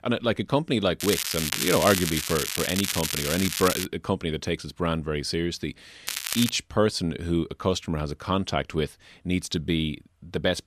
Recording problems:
crackling; loud; from 1 to 4 s and at 6 s; 1 dB below the speech

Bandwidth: 14.5 kHz